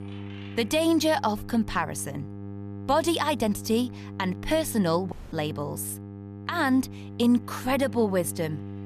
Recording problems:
electrical hum; noticeable; throughout; 50 Hz, 20 dB below the speech
household noises; faint; throughout; 30 dB below the speech
audio cutting out; at 5 s

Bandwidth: 14.5 kHz